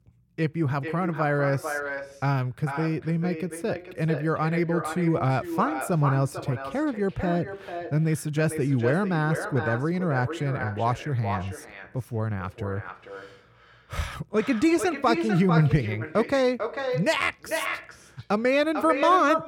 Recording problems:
echo of what is said; strong; throughout; 450 ms later, 8 dB below the speech

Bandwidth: 18 kHz